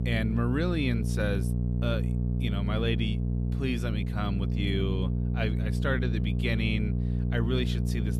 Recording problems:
electrical hum; loud; throughout; 60 Hz, 6 dB below the speech

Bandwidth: 15 kHz